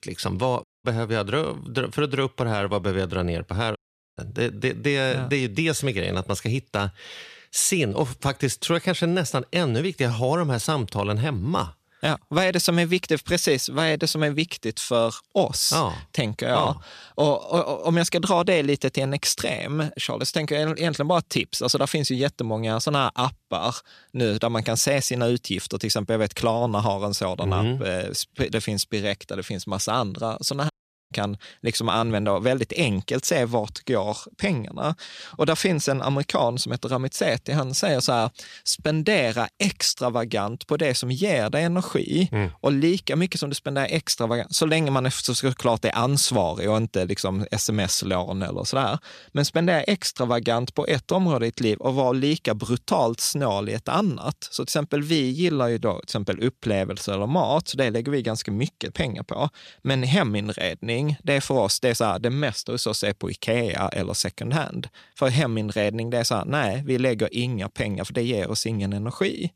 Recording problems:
audio cutting out; at 0.5 s, at 4 s and at 31 s

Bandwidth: 14 kHz